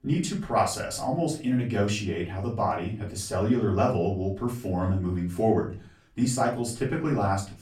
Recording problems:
off-mic speech; far
room echo; slight; dies away in 0.3 s

